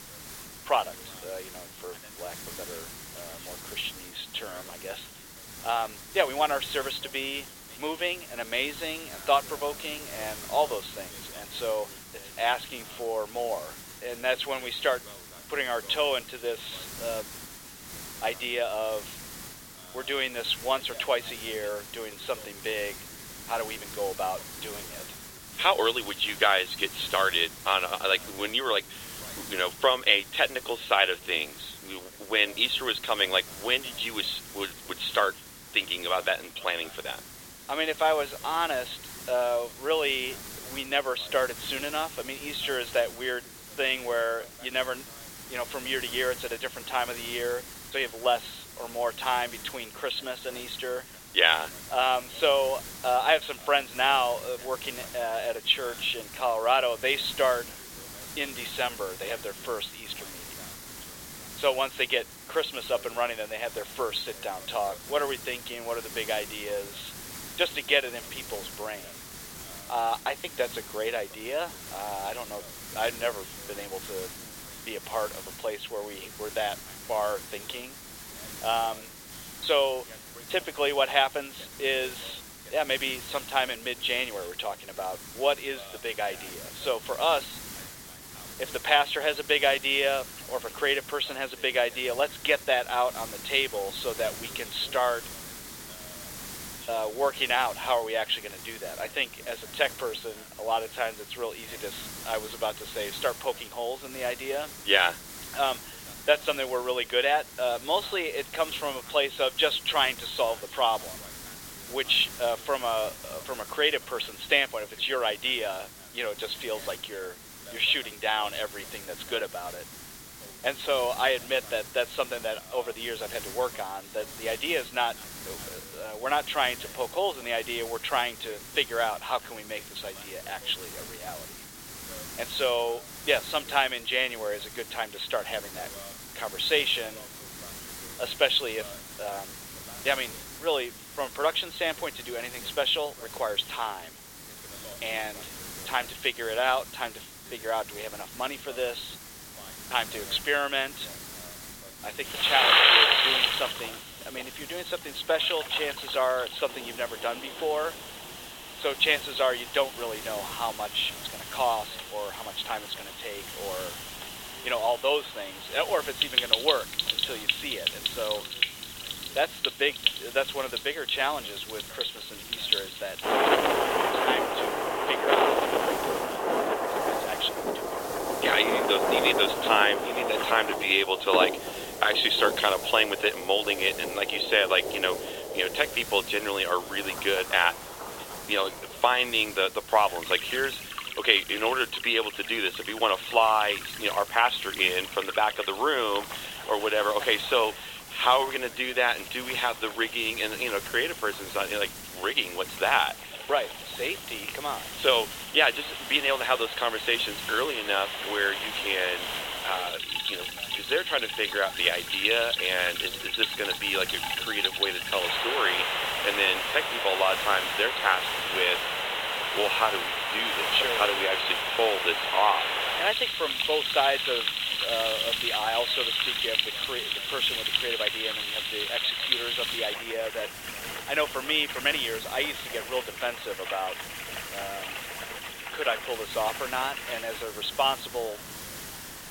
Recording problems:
thin; very; fading below 450 Hz
high frequencies cut off; severe; nothing above 4 kHz
rain or running water; loud; from 2:33 on; 1 dB below the speech
hiss; noticeable; throughout; 15 dB below the speech
voice in the background; faint; throughout; 25 dB below the speech

